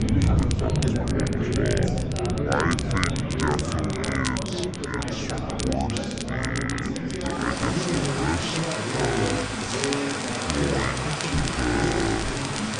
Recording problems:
wrong speed and pitch; too slow and too low; 0.6 times normal speed
echo of what is said; faint; throughout; 540 ms later, 25 dB below the speech
chatter from many people; very loud; throughout; 1 dB above the speech
rain or running water; loud; throughout; as loud as the speech
crackle, like an old record; loud; 6 dB below the speech

